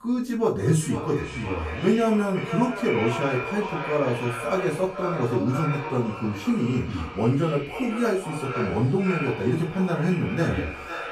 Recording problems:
echo of what is said; strong; throughout; 500 ms later, 8 dB below the speech
off-mic speech; far
room echo; slight; dies away in 0.3 s

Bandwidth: 14.5 kHz